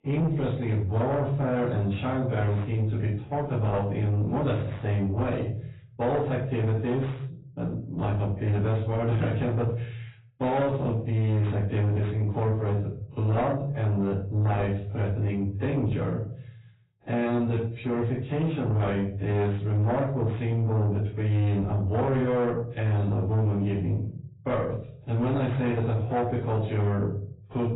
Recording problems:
off-mic speech; far
garbled, watery; badly; nothing above 4 kHz
room echo; slight; dies away in 0.5 s
distortion; slight; 10 dB below the speech

